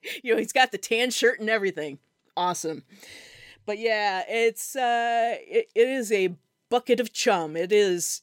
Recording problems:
none

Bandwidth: 16.5 kHz